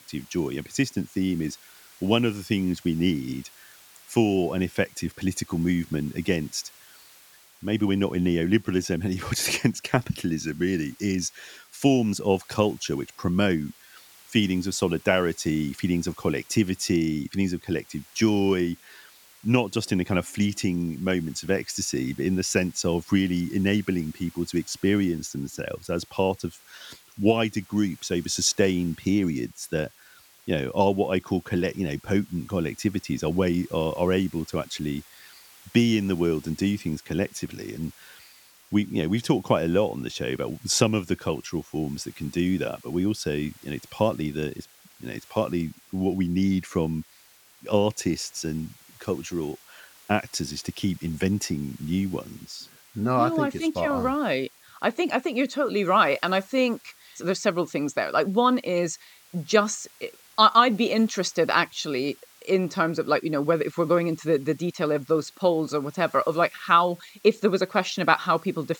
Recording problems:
hiss; faint; throughout; 25 dB below the speech

